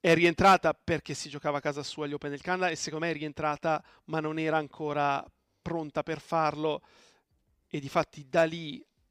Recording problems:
none

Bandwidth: 15 kHz